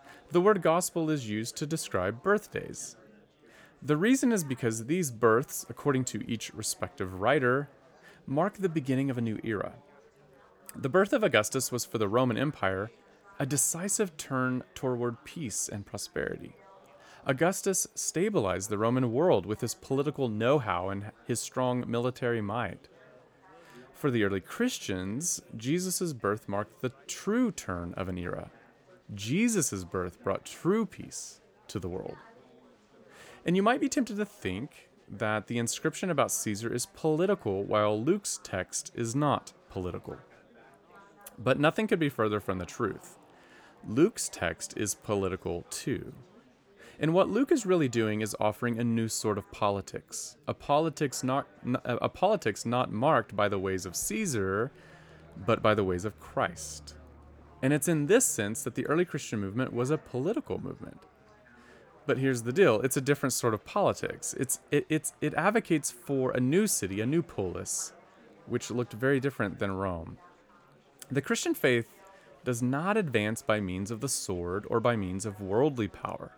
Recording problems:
chatter from many people; faint; throughout; 30 dB below the speech

